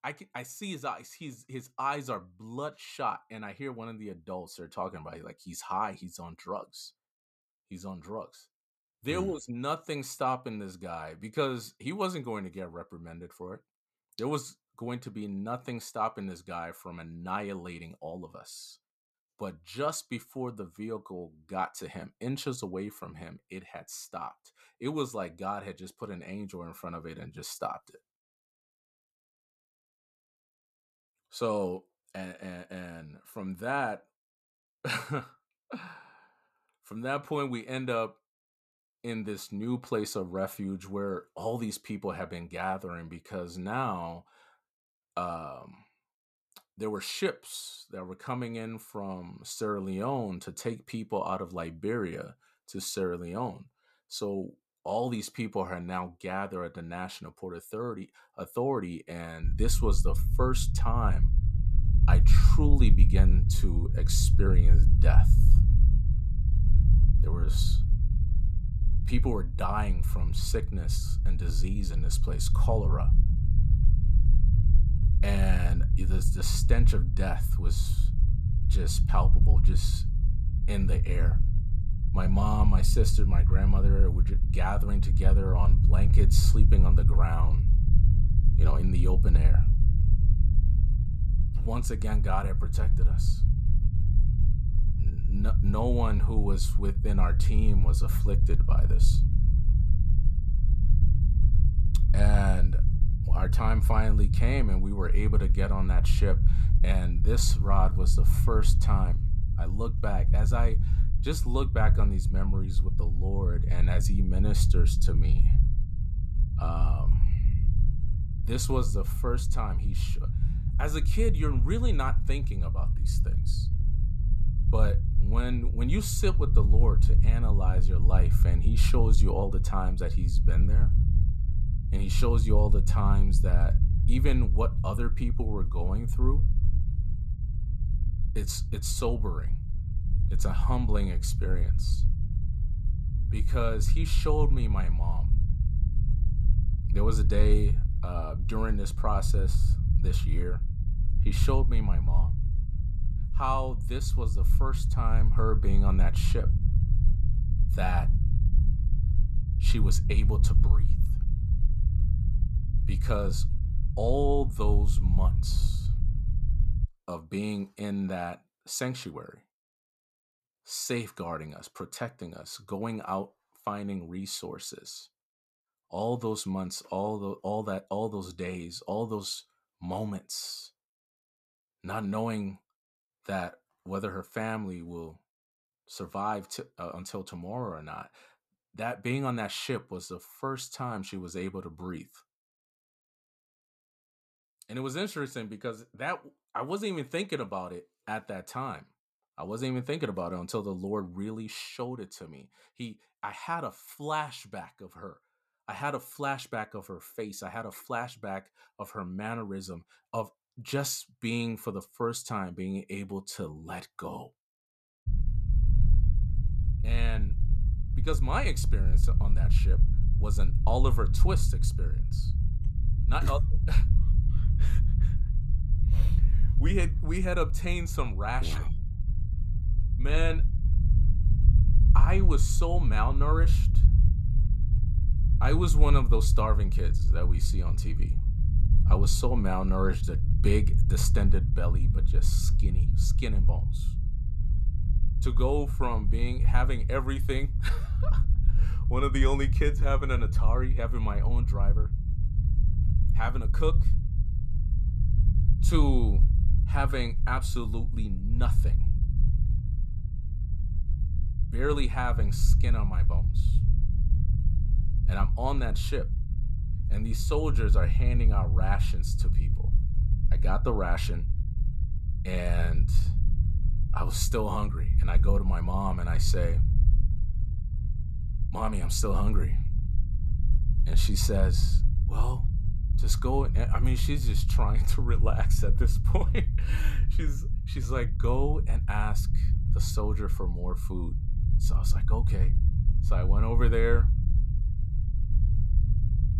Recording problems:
low rumble; loud; from 59 s to 2:47 and from 3:35 on; 9 dB below the speech

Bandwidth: 14.5 kHz